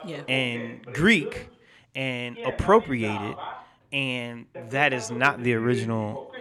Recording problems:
voice in the background; noticeable; throughout; 15 dB below the speech

